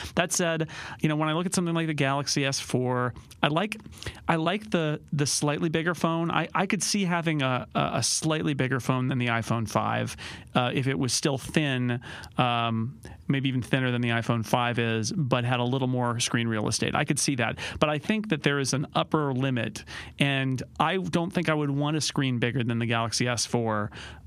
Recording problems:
squashed, flat; somewhat

